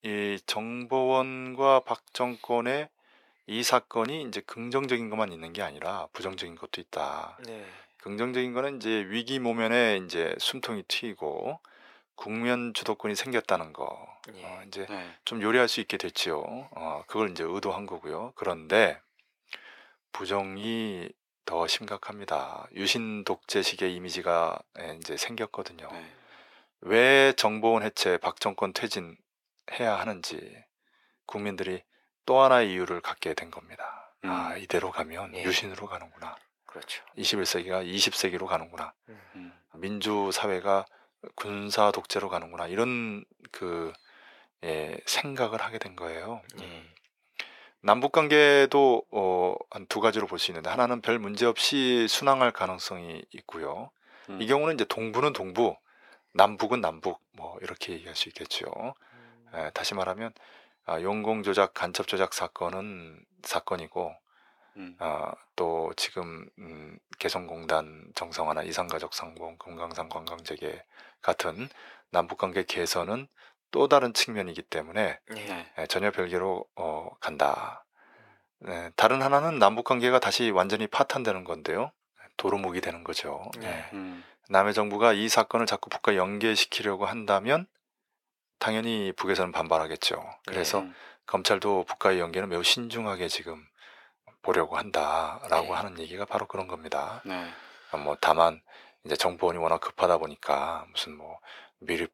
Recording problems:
thin; very; fading below 550 Hz

